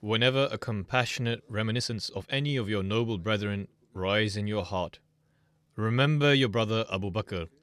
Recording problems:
uneven, jittery; strongly; from 0.5 to 6.5 s

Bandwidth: 13.5 kHz